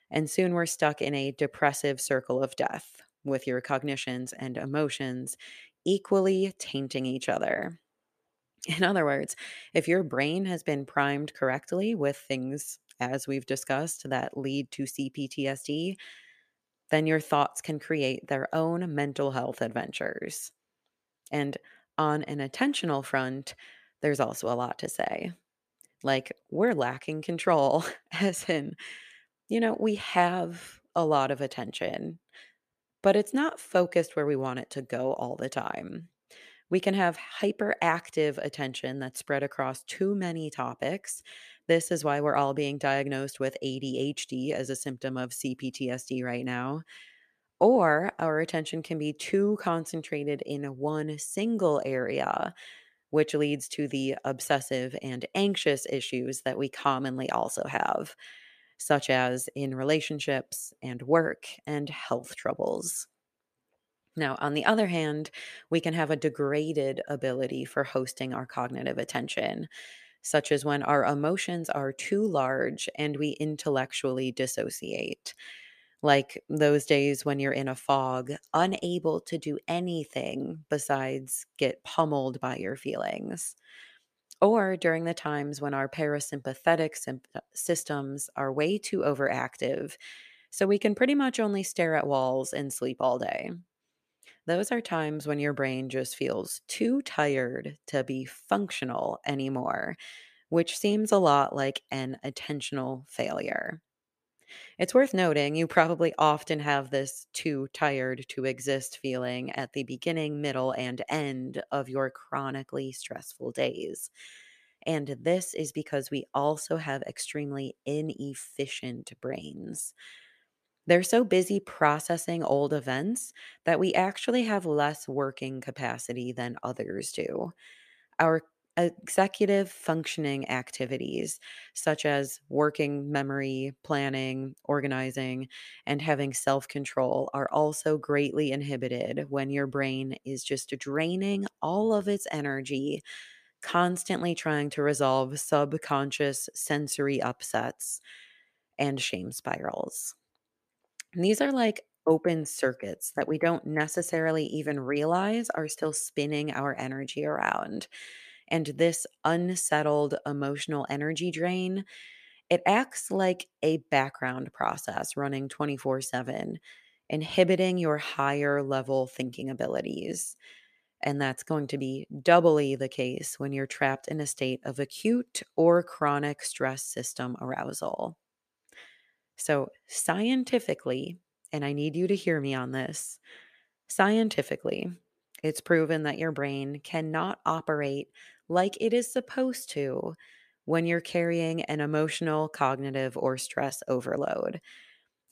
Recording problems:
none

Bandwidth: 14.5 kHz